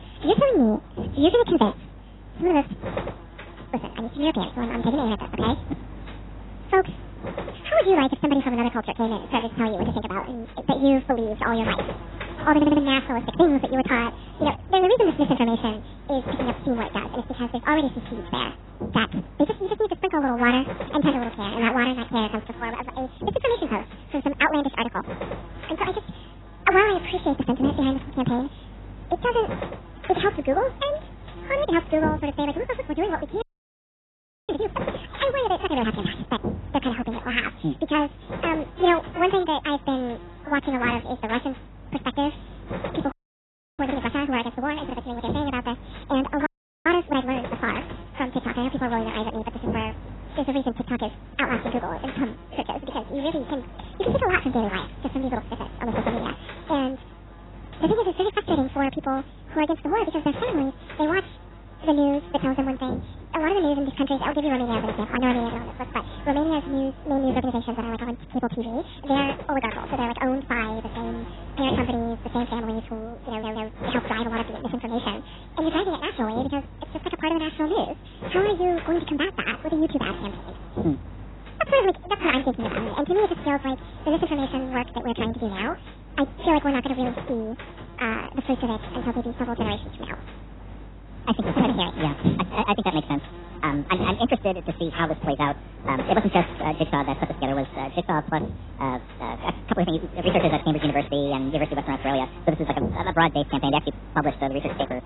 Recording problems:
garbled, watery; badly; nothing above 4 kHz
wrong speed and pitch; too fast and too high; 1.7 times normal speed
electrical hum; noticeable; throughout; 50 Hz, 15 dB below the speech
audio stuttering; at 13 s and at 1:13
audio freezing; at 33 s for 1 s, at 43 s for 0.5 s and at 46 s

